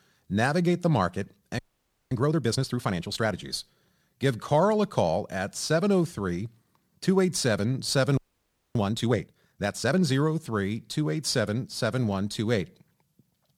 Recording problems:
audio freezing; at 1.5 s for 0.5 s and at 8 s for 0.5 s

